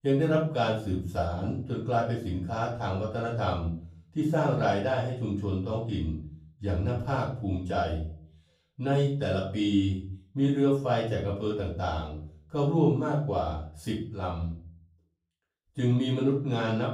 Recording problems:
off-mic speech; far
room echo; noticeable; dies away in 0.5 s

